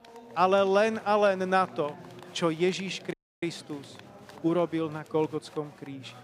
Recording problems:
chatter from many people; faint; throughout; 20 dB below the speech
audio cutting out; at 3 s

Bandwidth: 15.5 kHz